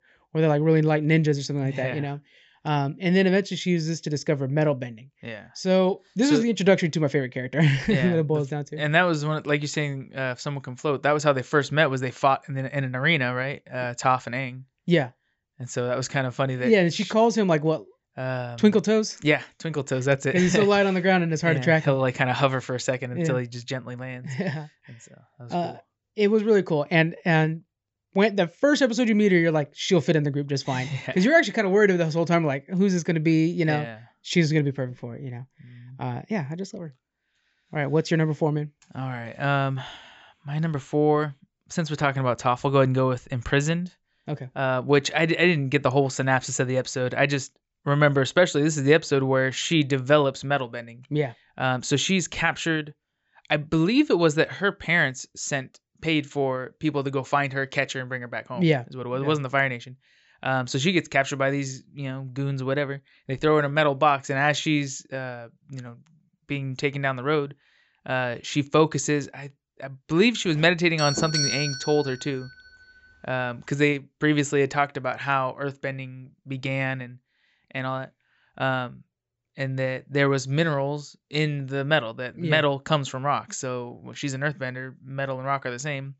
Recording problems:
high frequencies cut off; noticeable; nothing above 7.5 kHz
doorbell; loud; from 1:10 to 1:12; peak level with the speech

